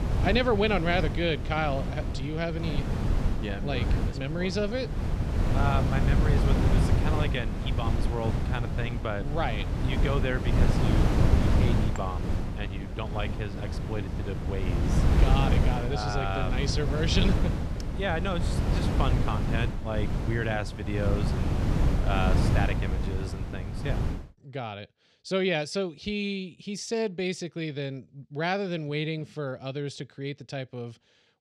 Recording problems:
wind noise on the microphone; heavy; until 24 s; 4 dB below the speech

